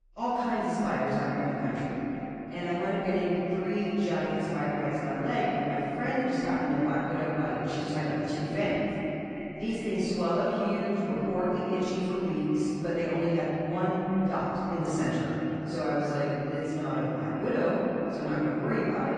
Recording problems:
echo of what is said; strong; throughout; 360 ms later, 9 dB below the speech
room echo; strong; dies away in 3 s
off-mic speech; far
garbled, watery; slightly; nothing above 9 kHz

